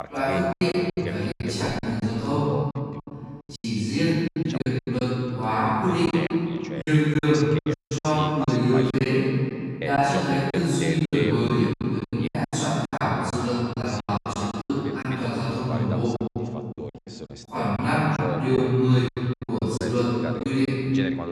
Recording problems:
room echo; strong; dies away in 2.5 s
off-mic speech; far
wrong speed, natural pitch; too slow; 0.6 times normal speed
voice in the background; noticeable; throughout; 10 dB below the speech
choppy; very; 13% of the speech affected
audio cutting out; at 7.5 s

